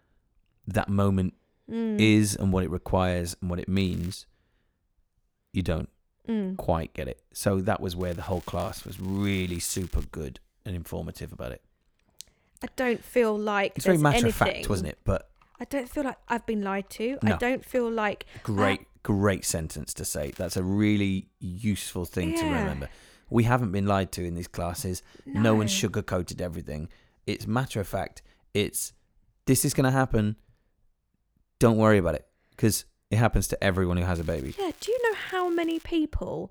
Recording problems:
crackling; faint; 4 times, first at 4 s; 25 dB below the speech

